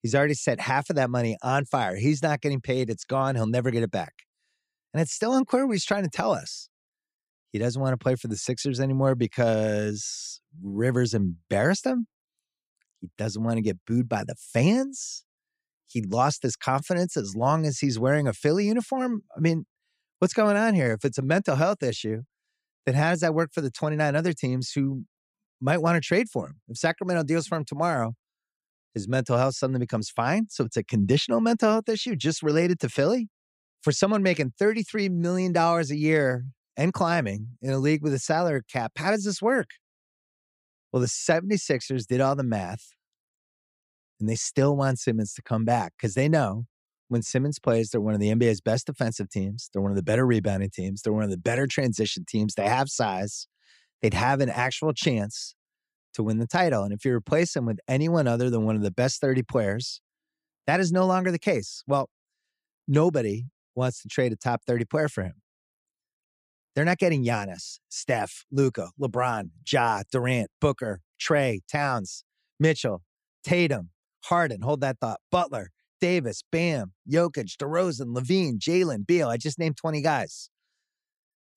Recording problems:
none

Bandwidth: 15 kHz